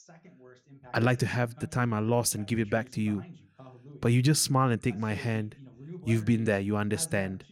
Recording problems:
voice in the background; faint; throughout; 20 dB below the speech

